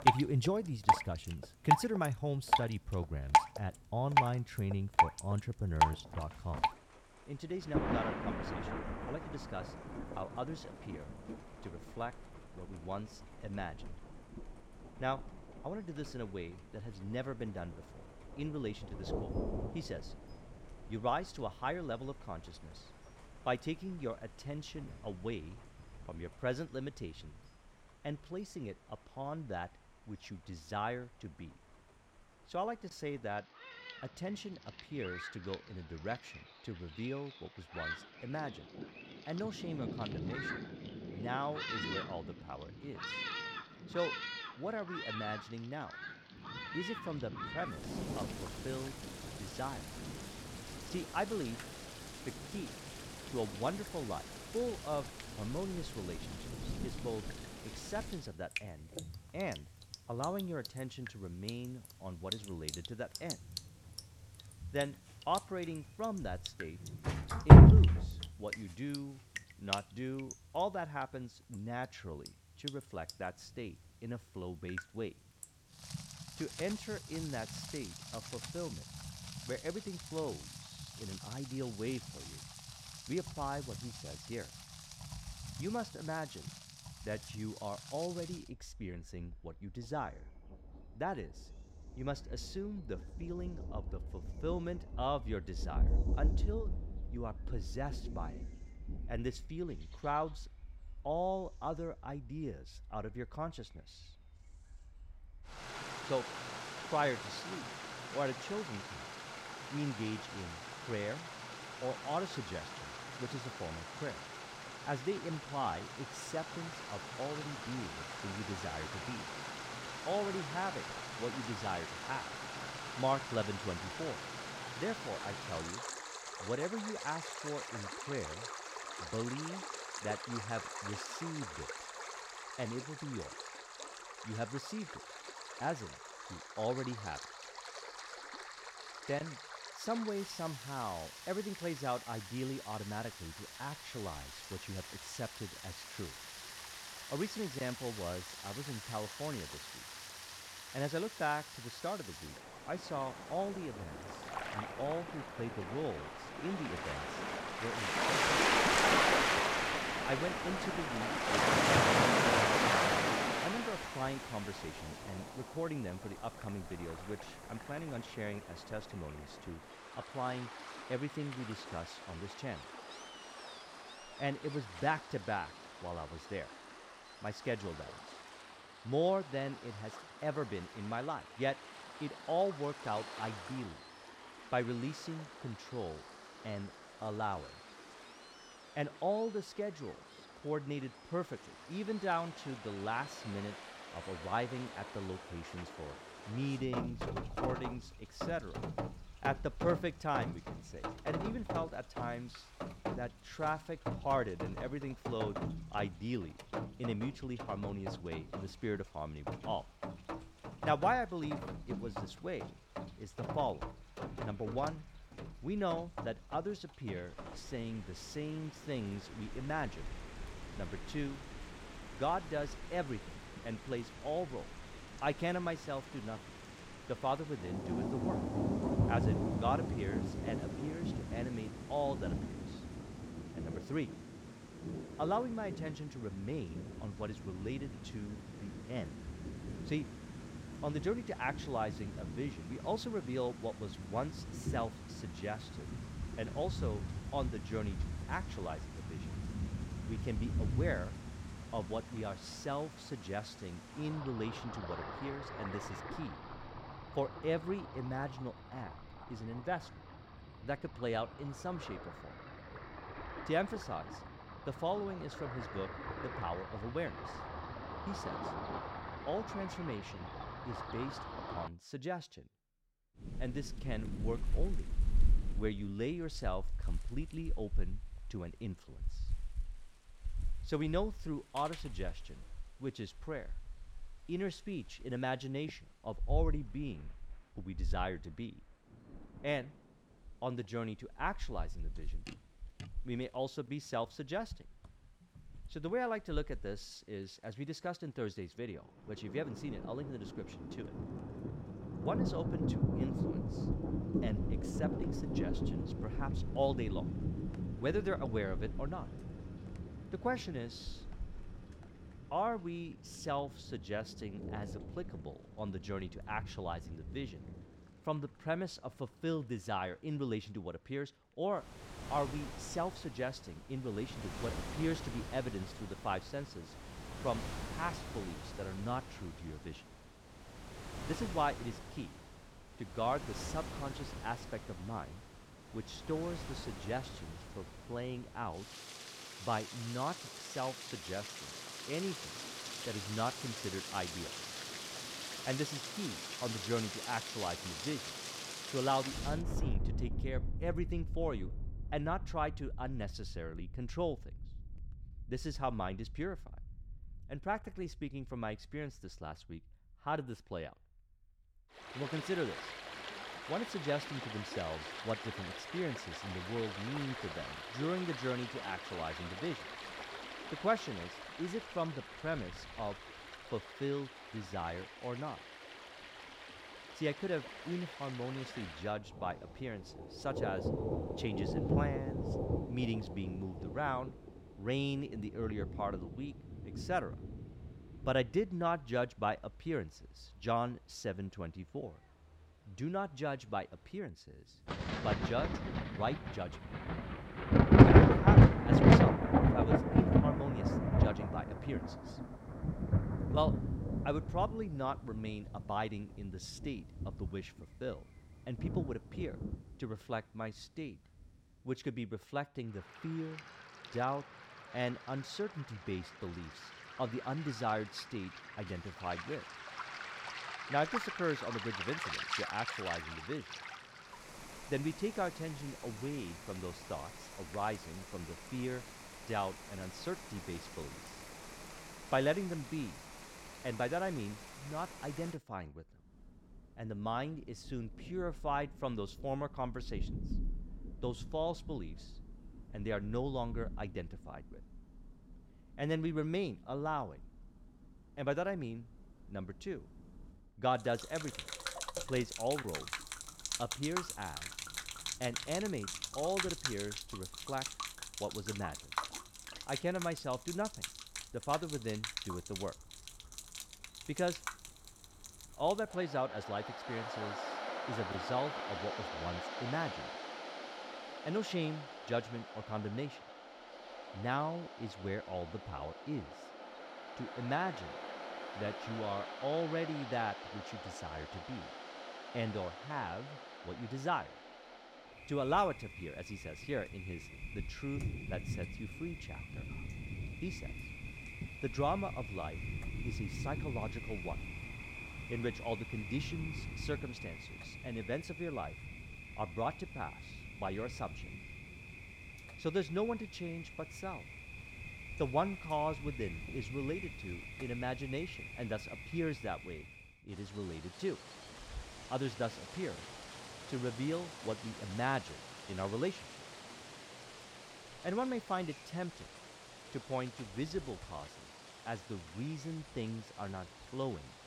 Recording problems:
rain or running water; very loud; throughout; 2 dB above the speech

